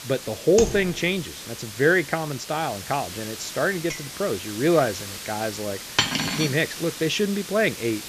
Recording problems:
high frequencies cut off; noticeable; nothing above 8 kHz
hiss; noticeable; throughout; 10 dB below the speech
keyboard typing; noticeable; at 0.5 s; peak 4 dB below the speech
clattering dishes; faint; at 4 s; peak 15 dB below the speech
clattering dishes; loud; at 6 s; peak 3 dB above the speech

